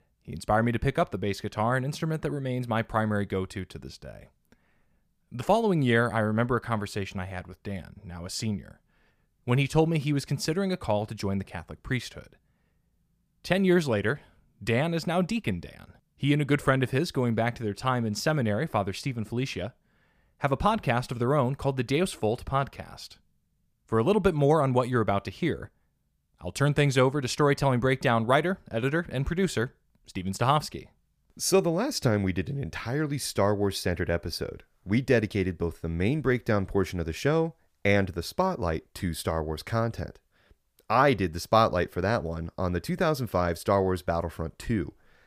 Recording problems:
none

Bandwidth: 15 kHz